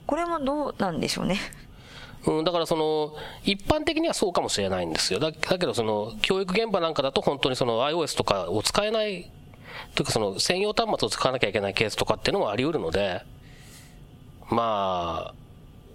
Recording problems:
squashed, flat; heavily

